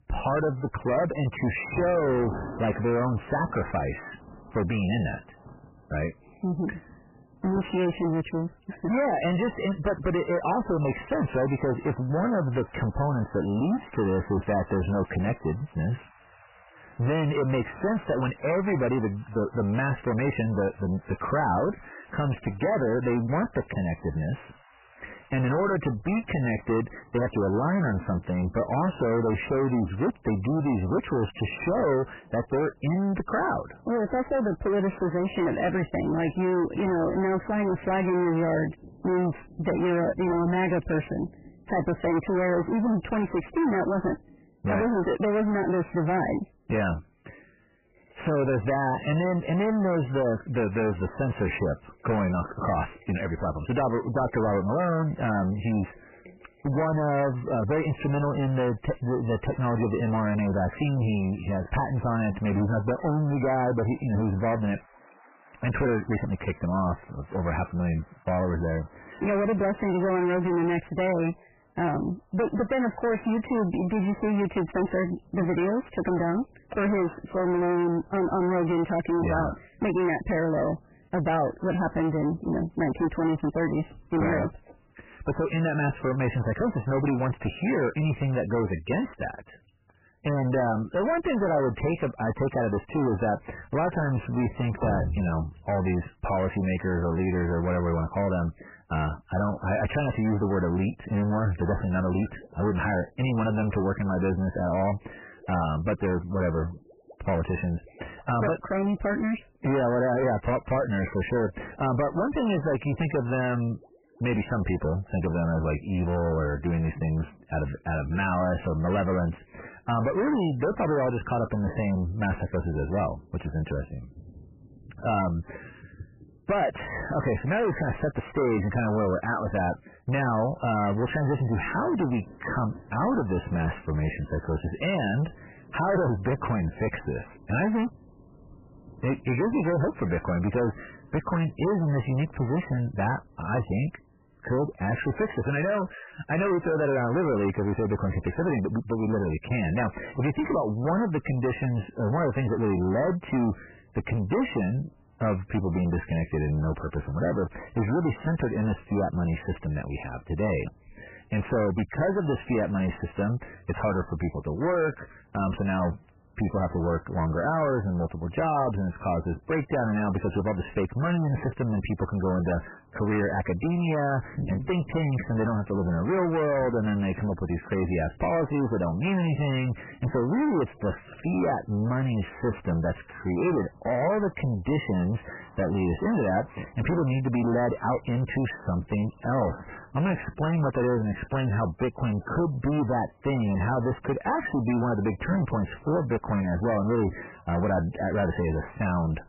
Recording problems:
distortion; heavy; 6 dB below the speech
garbled, watery; badly; nothing above 3 kHz
rain or running water; faint; throughout; 20 dB below the speech

